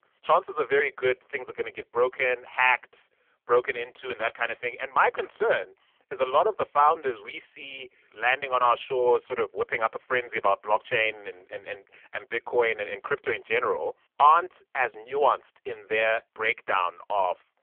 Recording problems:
phone-call audio; poor line

